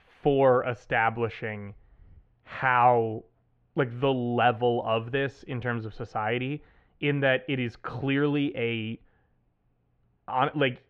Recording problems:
muffled; very; fading above 2.5 kHz

